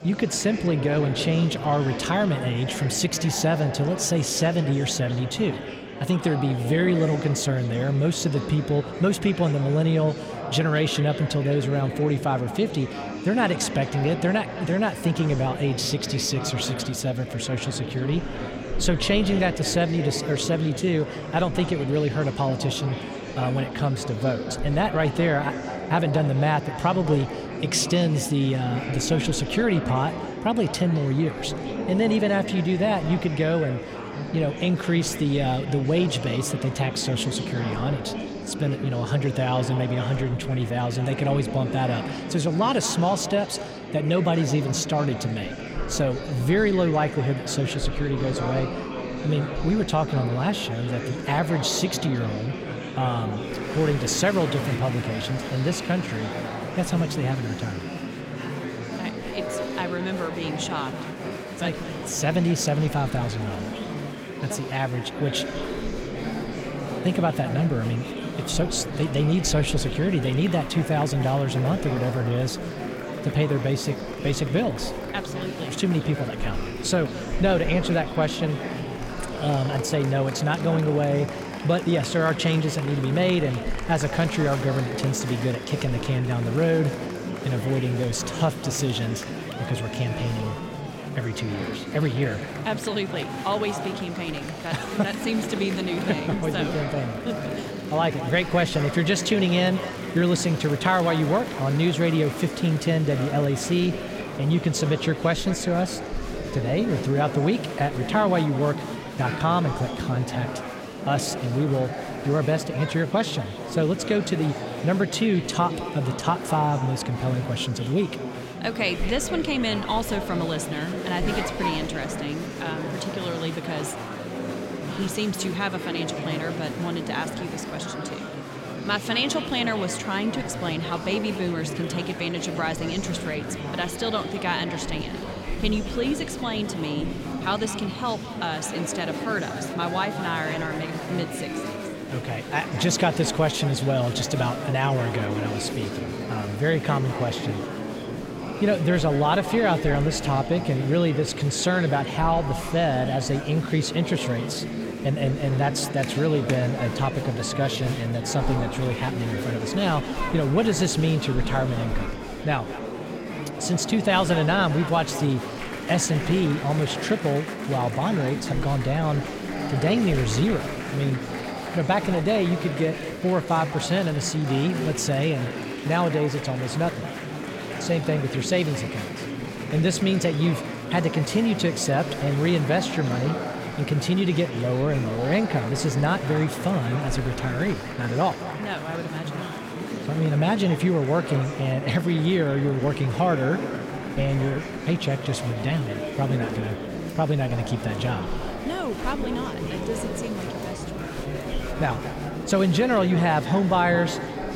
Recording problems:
echo of what is said; noticeable; throughout; 220 ms later, 15 dB below the speech
murmuring crowd; loud; throughout; 7 dB below the speech

